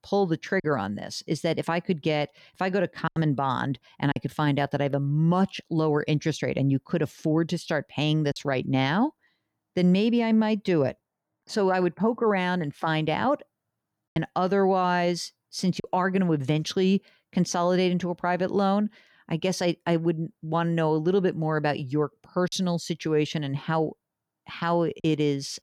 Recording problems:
choppy; occasionally; 2% of the speech affected

